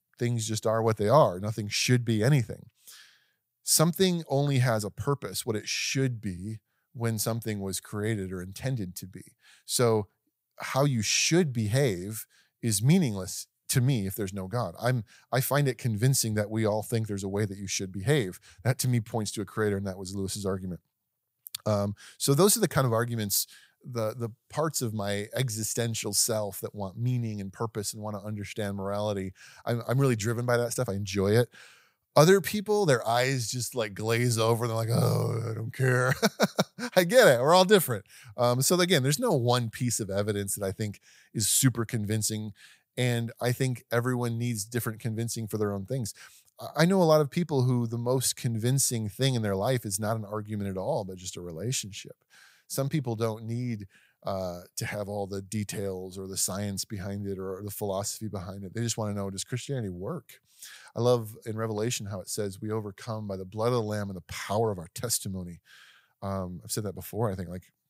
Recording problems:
none

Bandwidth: 15.5 kHz